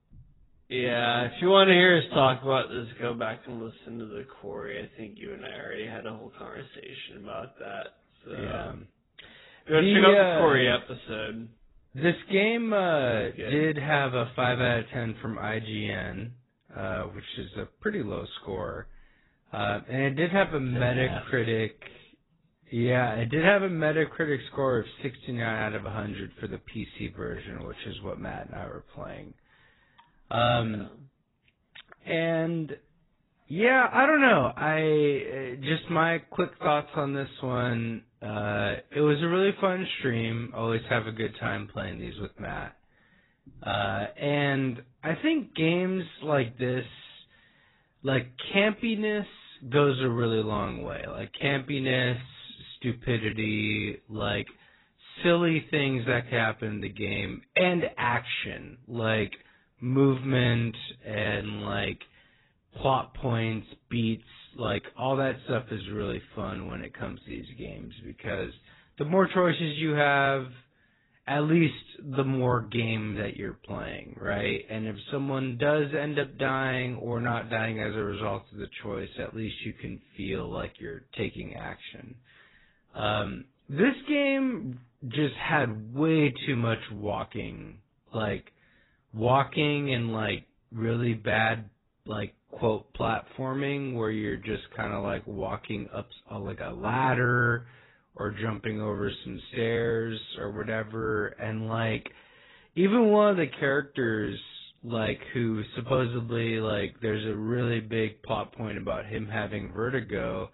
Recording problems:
garbled, watery; badly; nothing above 4 kHz
wrong speed, natural pitch; too slow; 0.6 times normal speed

